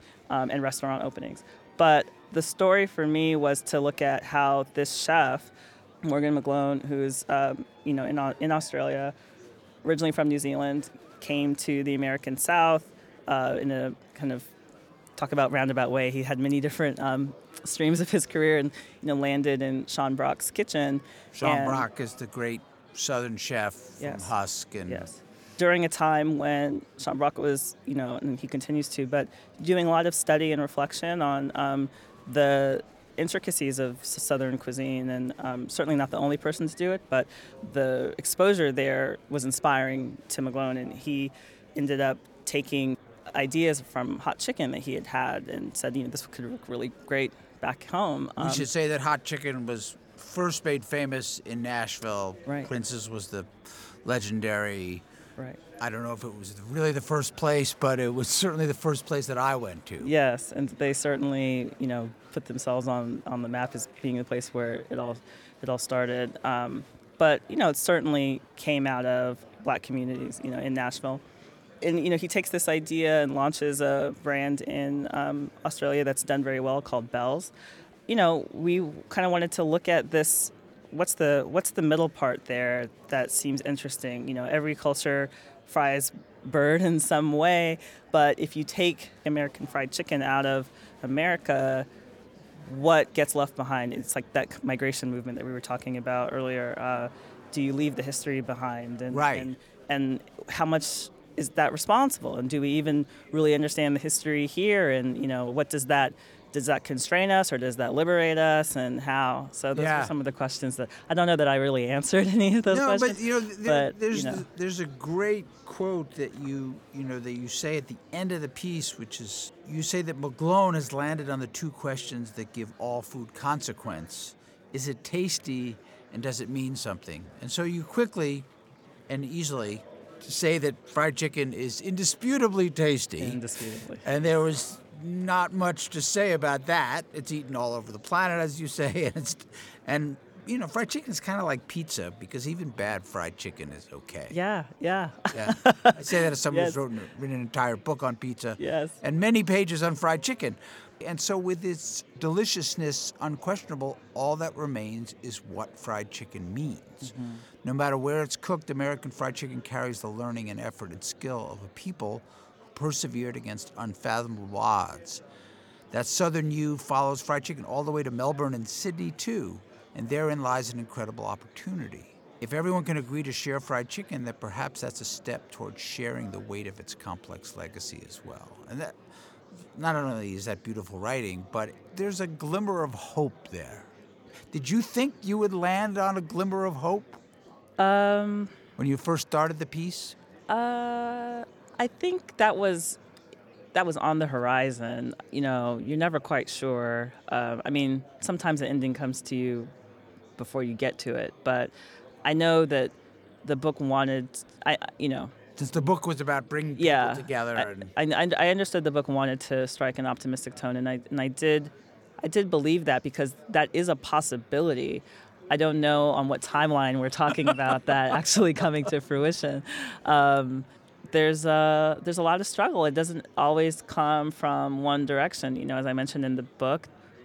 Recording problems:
murmuring crowd; faint; throughout; 25 dB below the speech

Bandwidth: 18 kHz